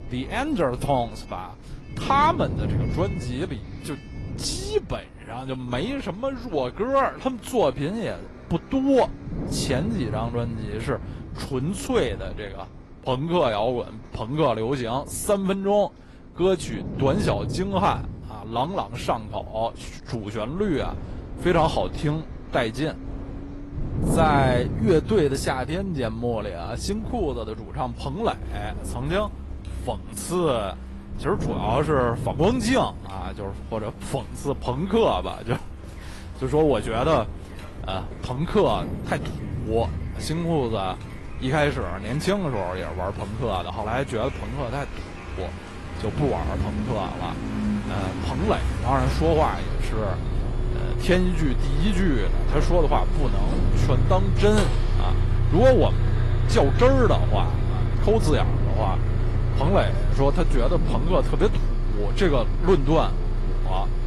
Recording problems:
garbled, watery; slightly; nothing above 11.5 kHz
traffic noise; loud; throughout; 4 dB below the speech
wind noise on the microphone; occasional gusts; 15 dB below the speech

